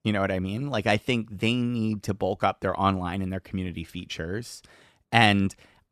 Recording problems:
none

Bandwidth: 14 kHz